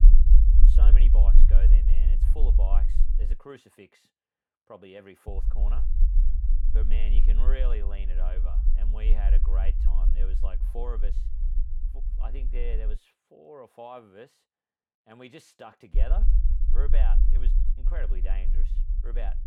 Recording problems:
low rumble; loud; until 3.5 s, from 5.5 to 13 s and from 16 s on; 5 dB below the speech

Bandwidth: 18 kHz